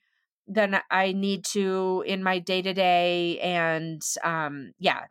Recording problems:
none

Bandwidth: 16 kHz